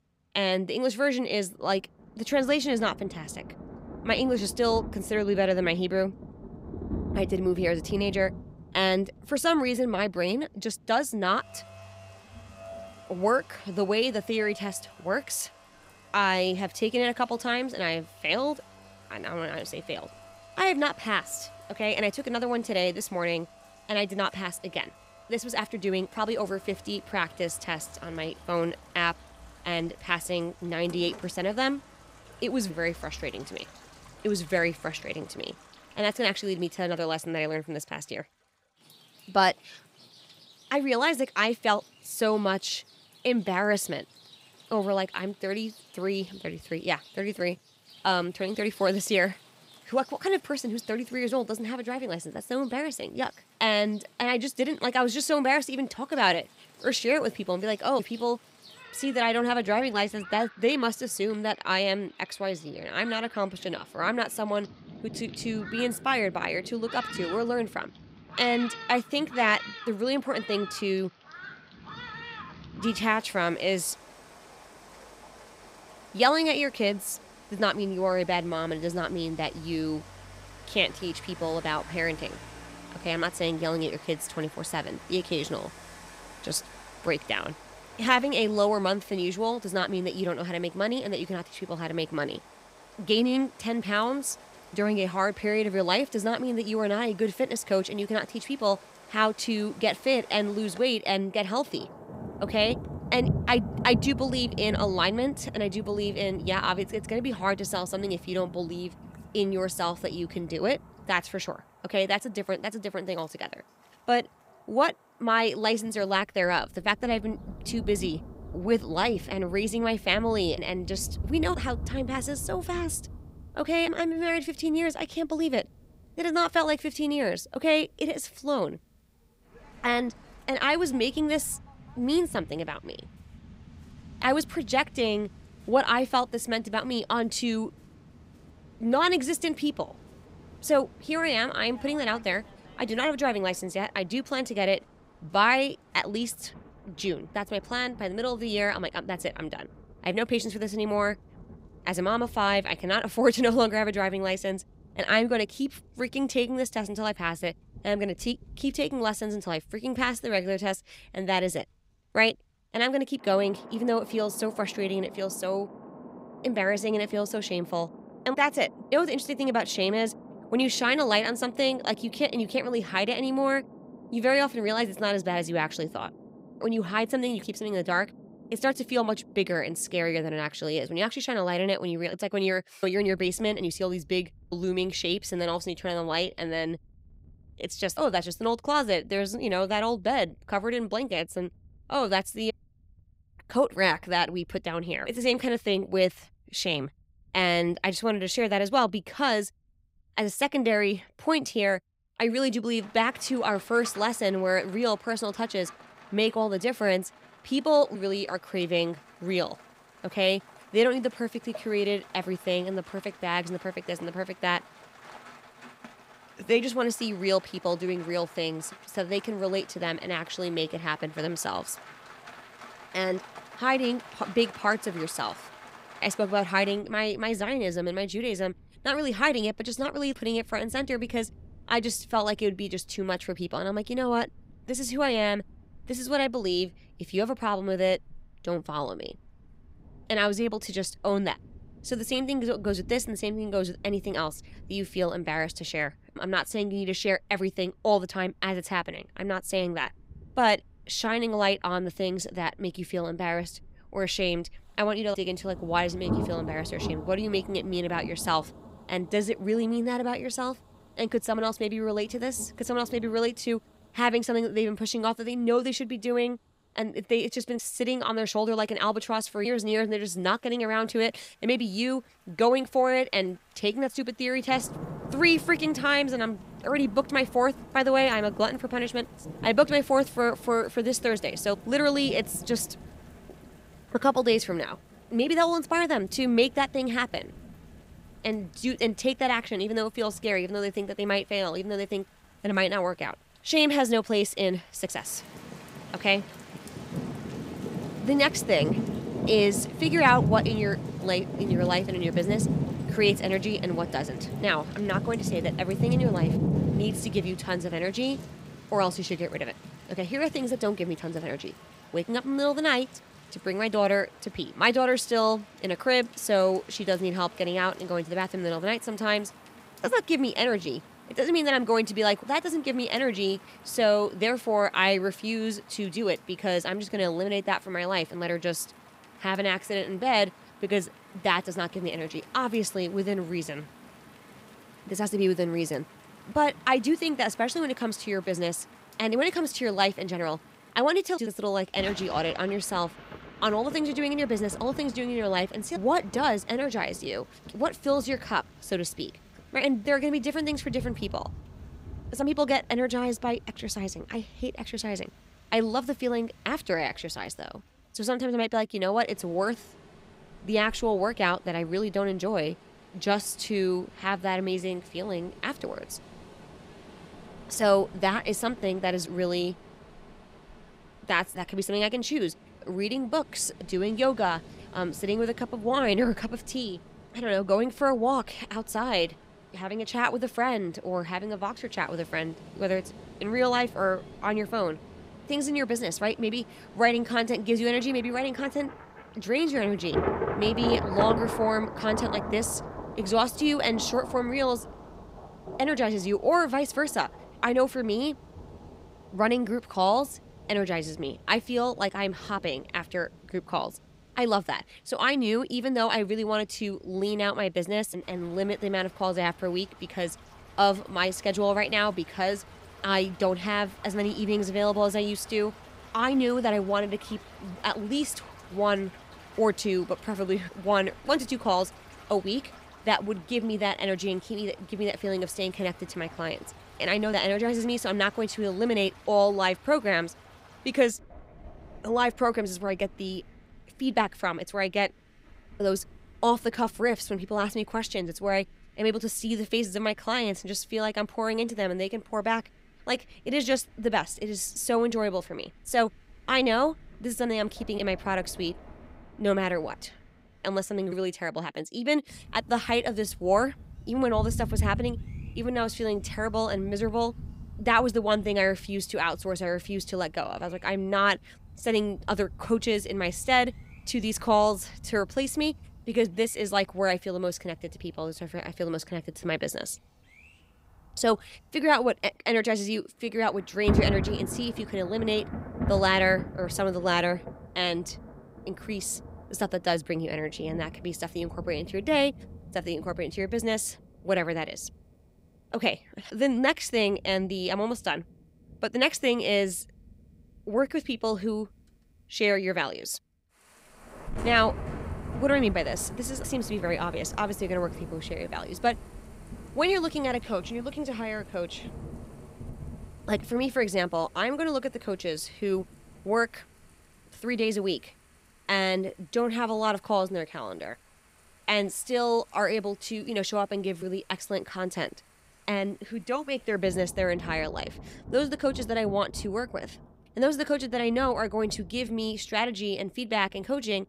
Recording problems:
rain or running water; noticeable; throughout; 15 dB below the speech

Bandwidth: 15.5 kHz